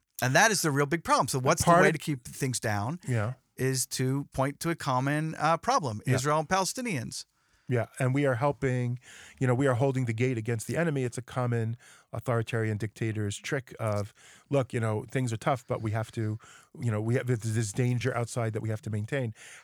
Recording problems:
uneven, jittery; slightly; from 2 to 18 s

